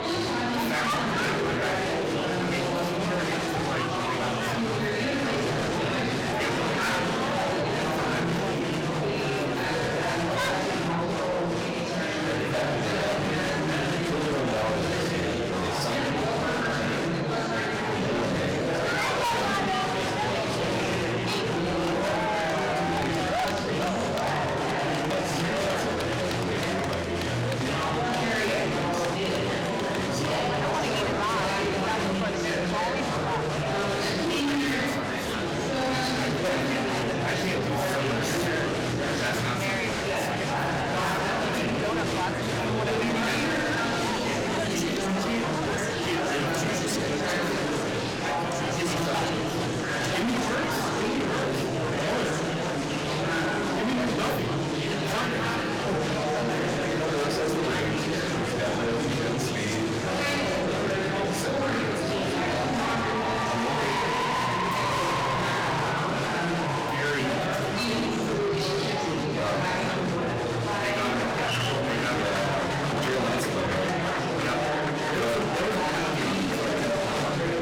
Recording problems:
distortion; heavy; 7 dB below the speech
off-mic speech; far
room echo; slight; dies away in 0.4 s
murmuring crowd; very loud; throughout; 4 dB above the speech
background music; very faint; throughout; 25 dB below the speech

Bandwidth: 17 kHz